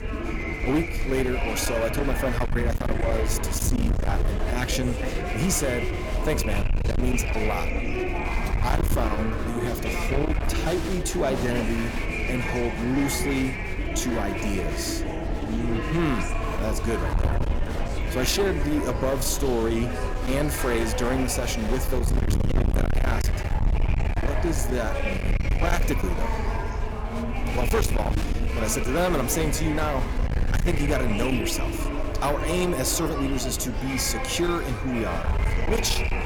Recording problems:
distortion; heavy; 18% of the sound clipped
murmuring crowd; loud; throughout; 4 dB below the speech
wind noise on the microphone; occasional gusts; 10 dB below the speech

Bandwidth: 17.5 kHz